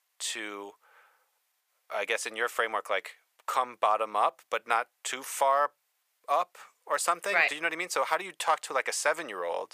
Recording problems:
thin; very; fading below 550 Hz

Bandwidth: 15 kHz